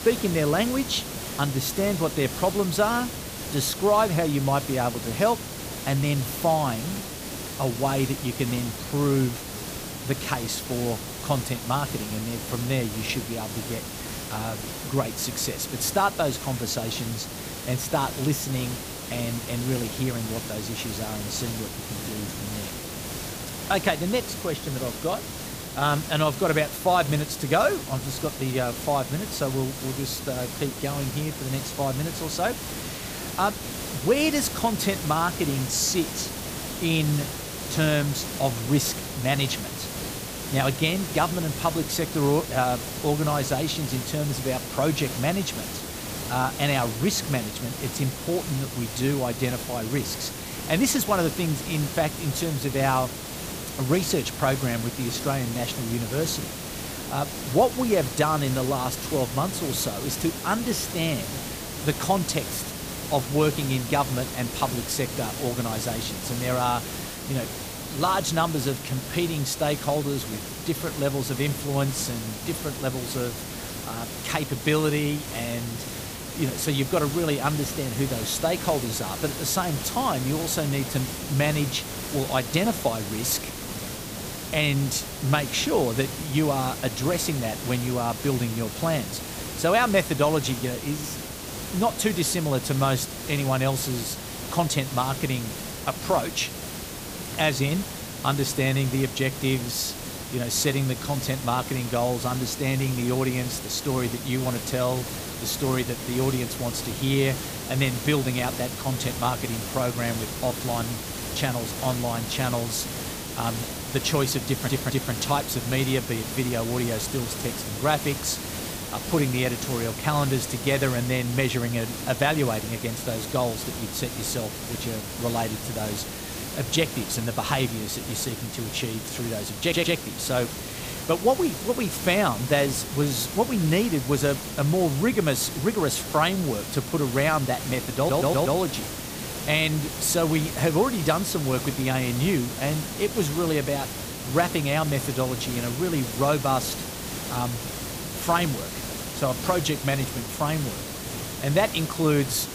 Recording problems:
hiss; loud; throughout; 6 dB below the speech
audio stuttering; at 1:54, at 2:10 and at 2:18

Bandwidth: 15 kHz